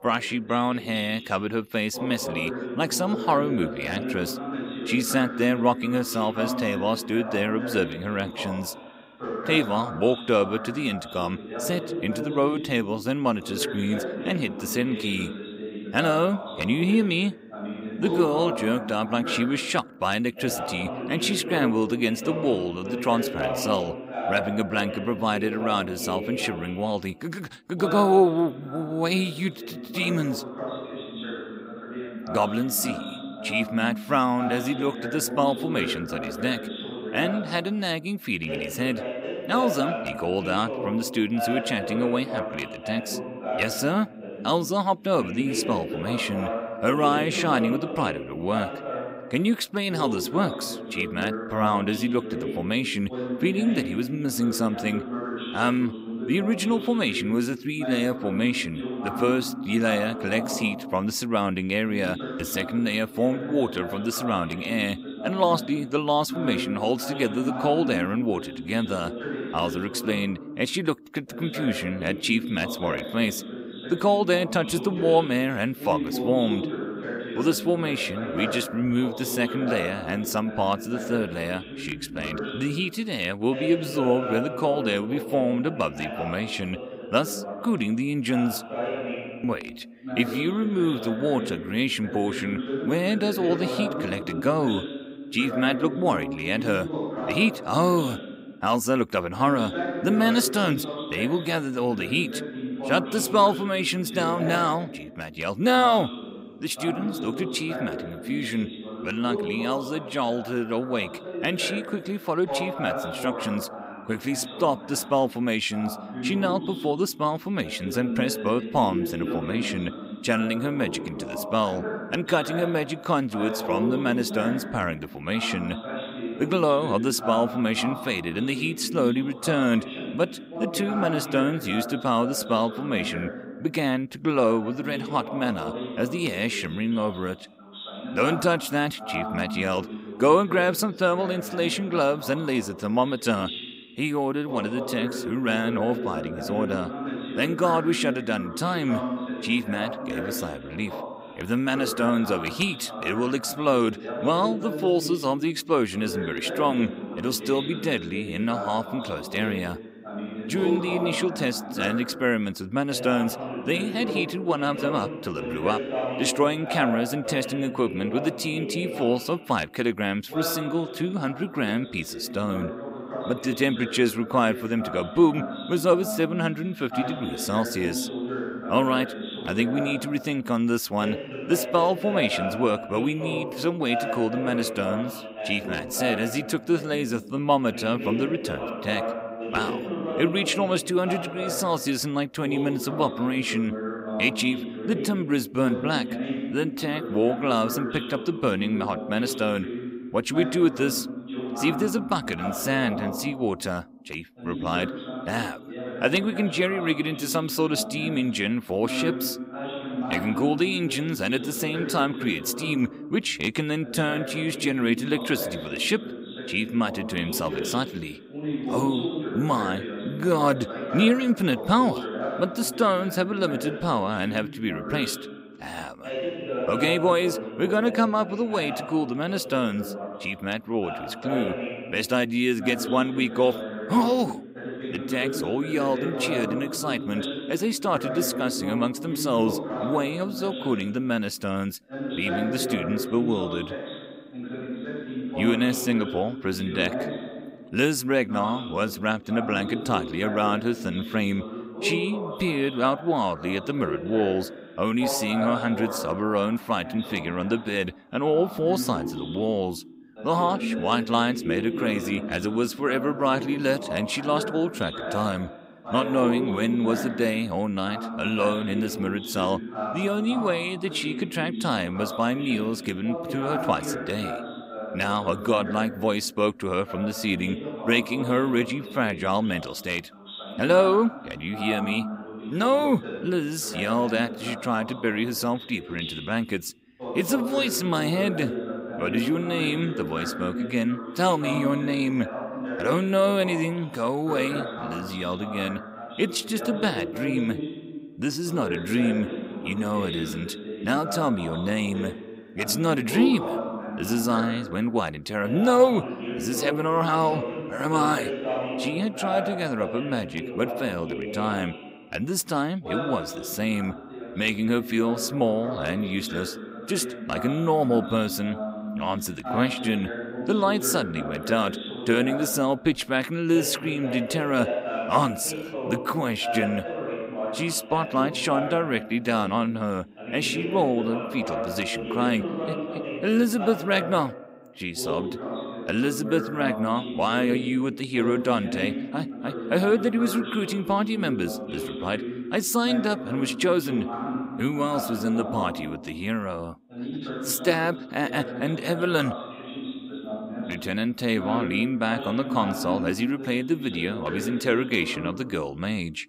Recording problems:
voice in the background; loud; throughout; 7 dB below the speech

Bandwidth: 15.5 kHz